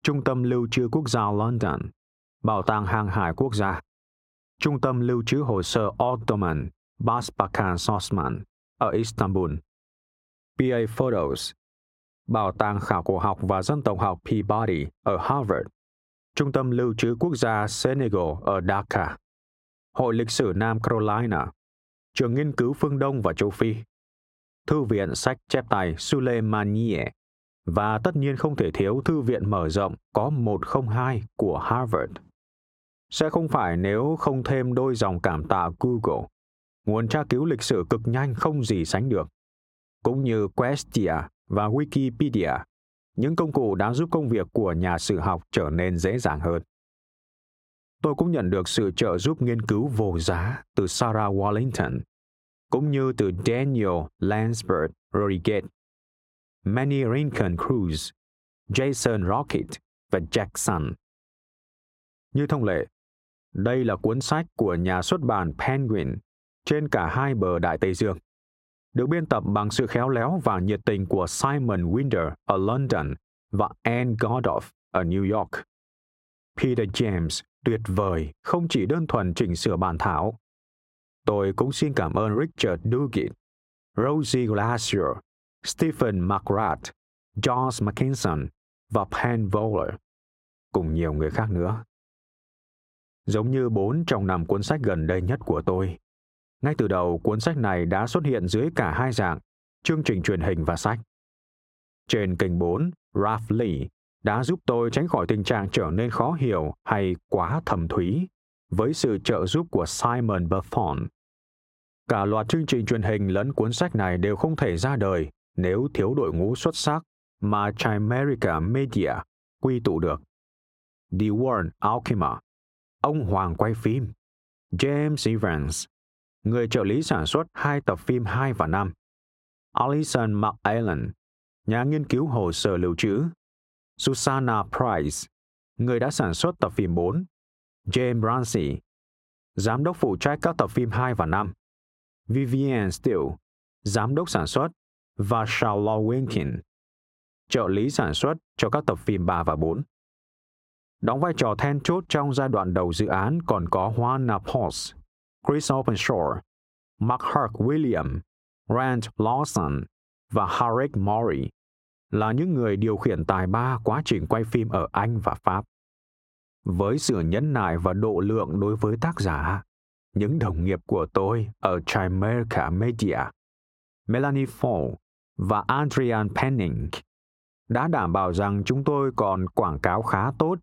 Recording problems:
muffled; very slightly; fading above 3 kHz
squashed, flat; somewhat

